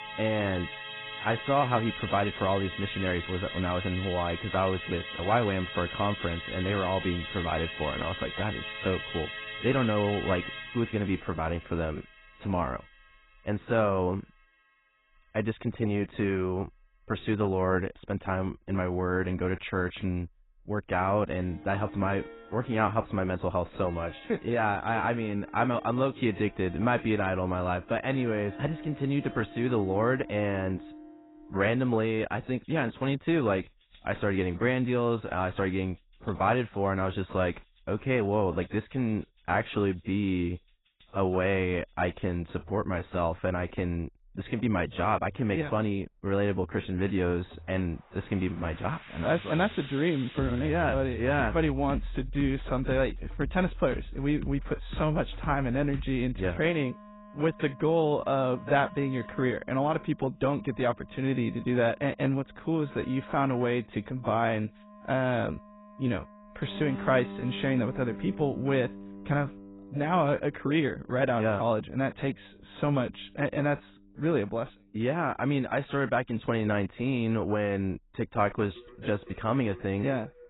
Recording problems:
garbled, watery; badly; nothing above 4 kHz
background music; noticeable; throughout; 10 dB below the speech

